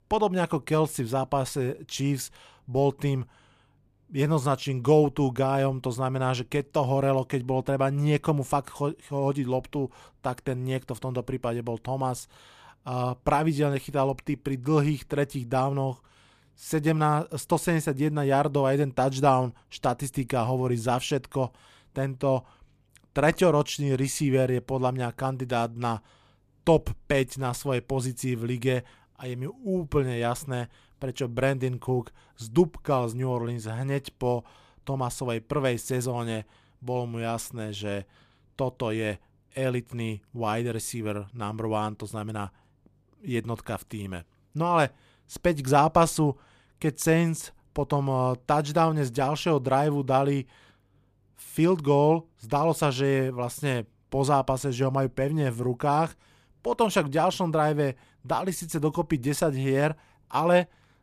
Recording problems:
none

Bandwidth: 14.5 kHz